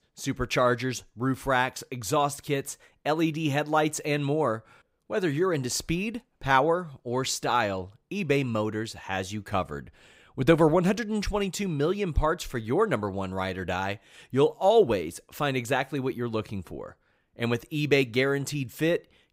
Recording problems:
none

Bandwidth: 15.5 kHz